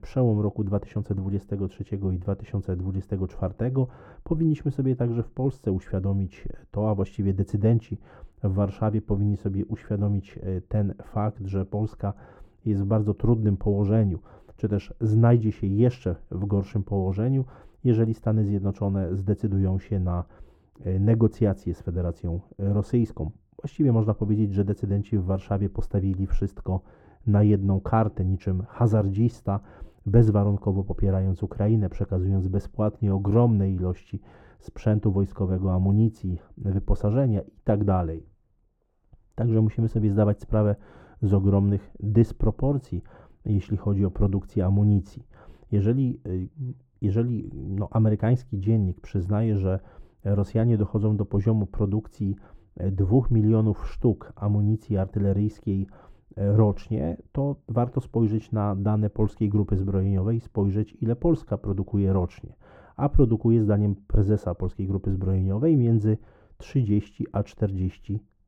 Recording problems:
muffled; very; fading above 1.5 kHz

